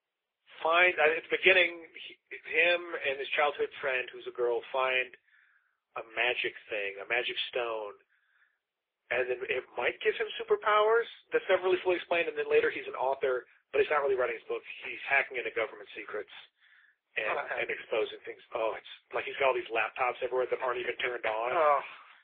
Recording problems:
phone-call audio; poor line; nothing above 3.5 kHz
thin; very; fading below 250 Hz
garbled, watery; slightly
muffled; very slightly; fading above 4 kHz

